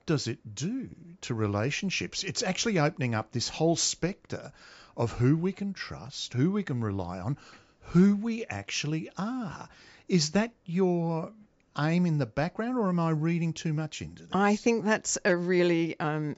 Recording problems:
high frequencies cut off; noticeable; nothing above 8 kHz

